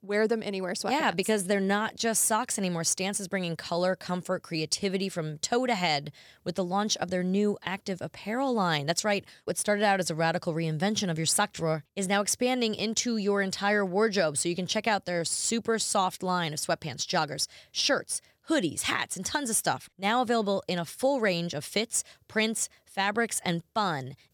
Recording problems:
none

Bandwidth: 18.5 kHz